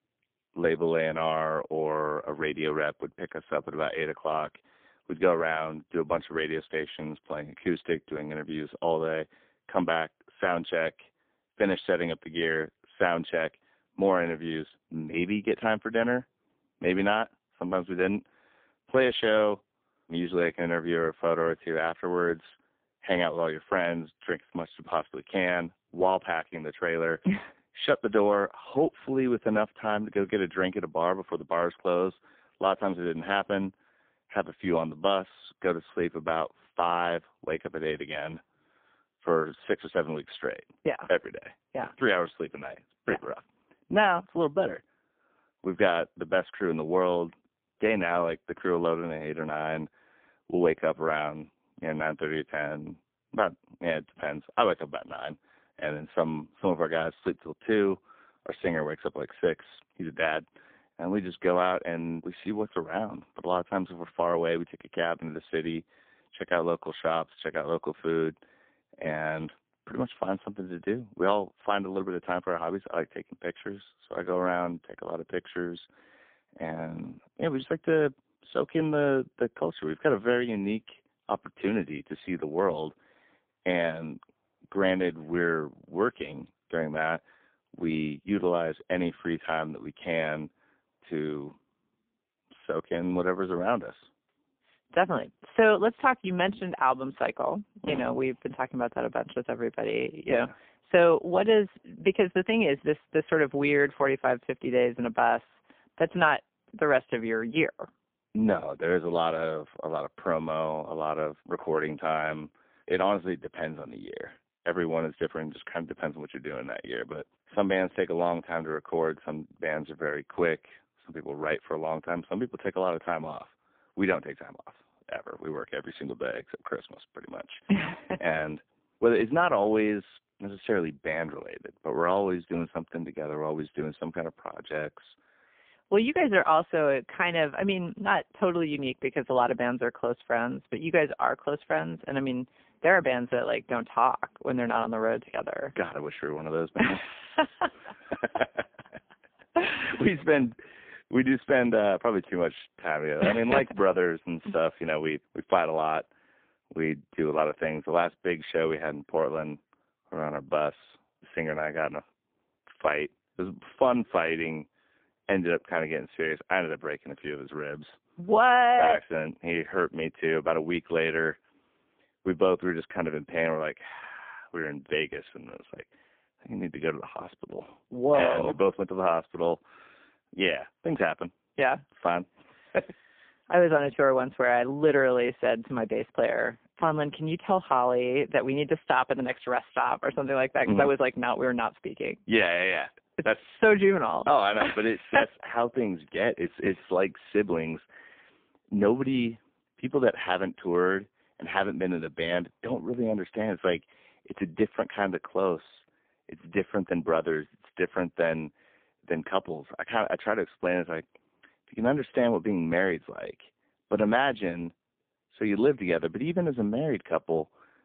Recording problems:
phone-call audio; poor line; nothing above 3 kHz

